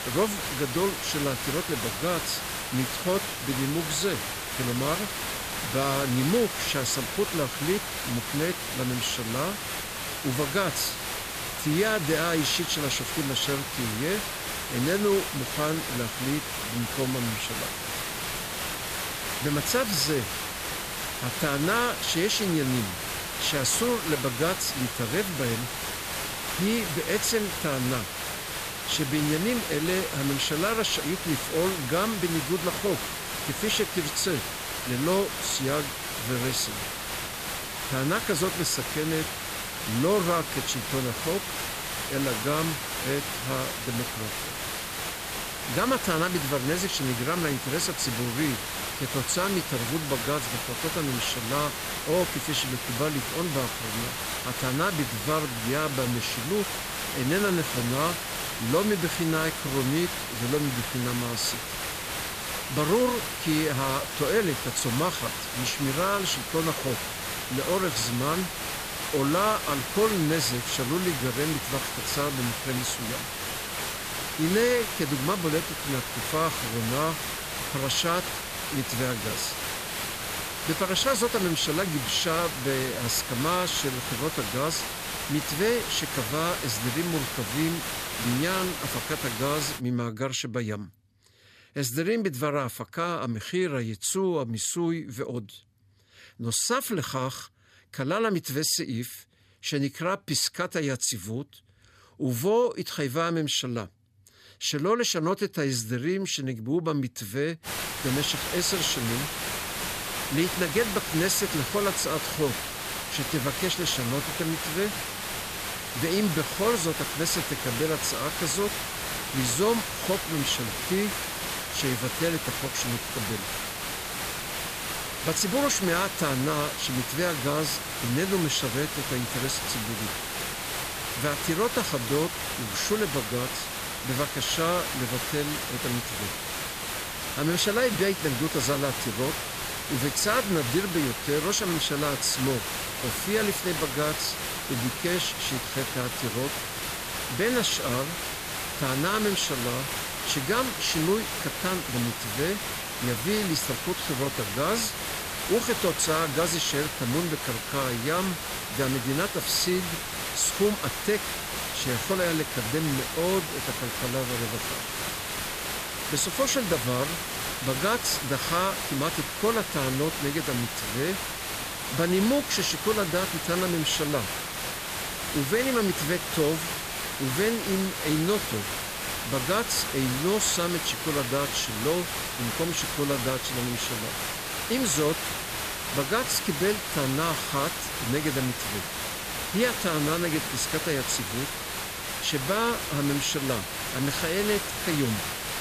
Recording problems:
hiss; loud; until 1:30 and from 1:48 on; 2 dB below the speech

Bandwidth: 14.5 kHz